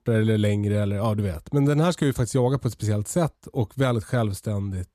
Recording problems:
none

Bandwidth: 14.5 kHz